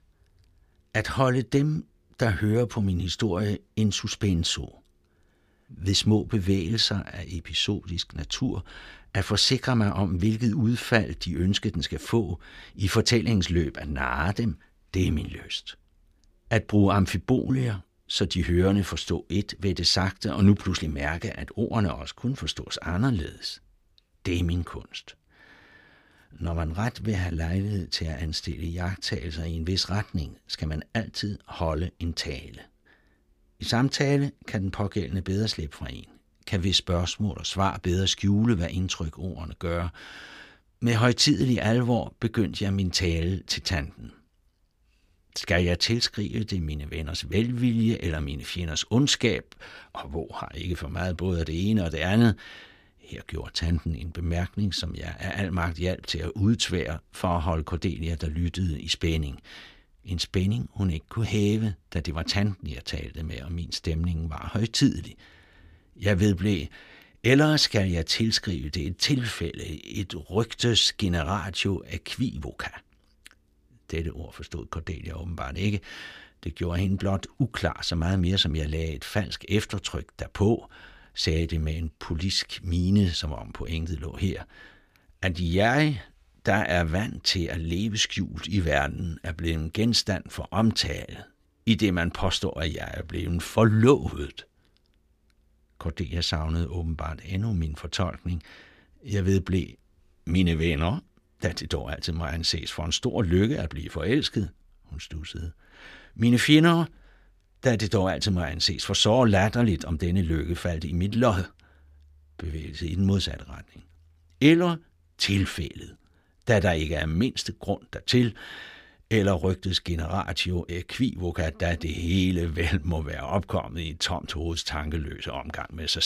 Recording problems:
abrupt cut into speech; at the end

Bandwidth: 15 kHz